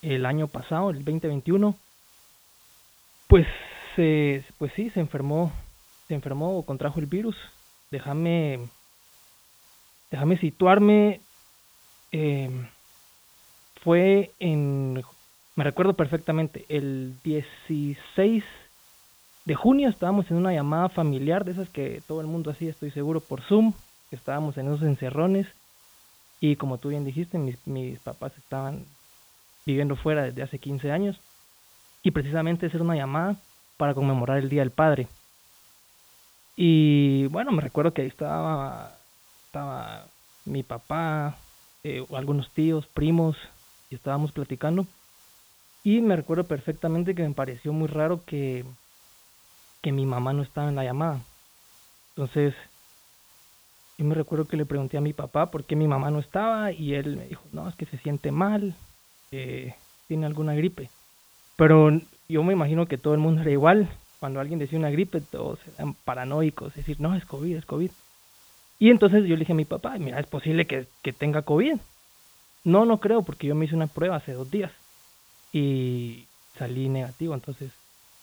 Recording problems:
high frequencies cut off; severe; nothing above 4 kHz
hiss; faint; throughout; 30 dB below the speech

